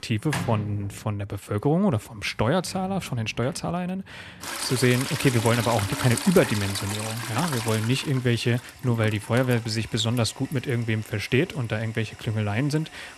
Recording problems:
household noises; loud; throughout; 7 dB below the speech

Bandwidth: 13.5 kHz